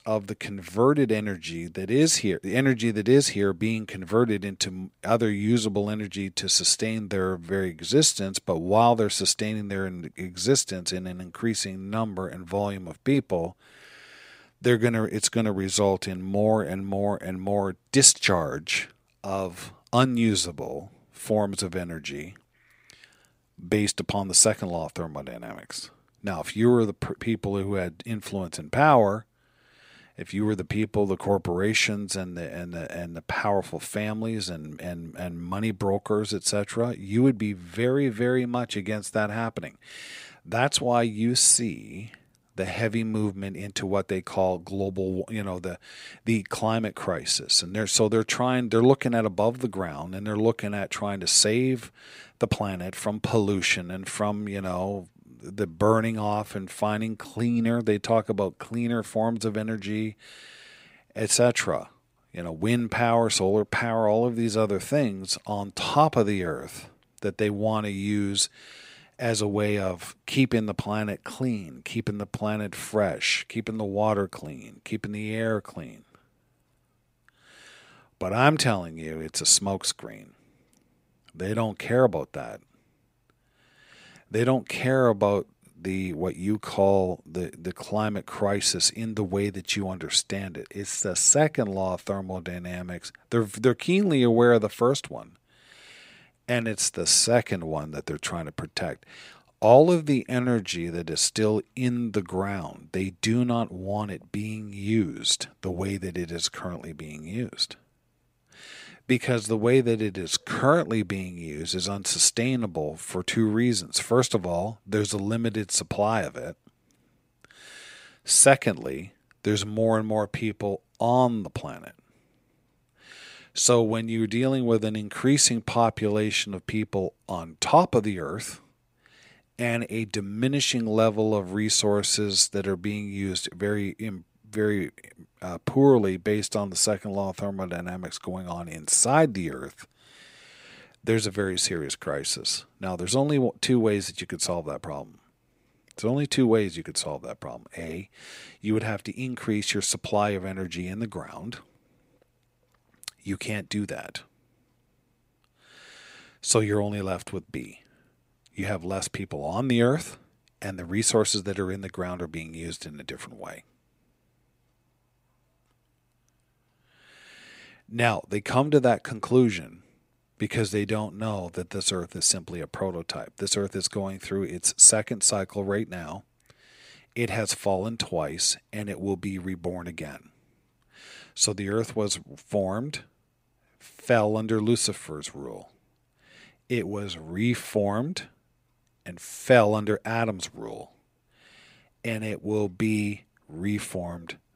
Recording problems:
none

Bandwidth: 15.5 kHz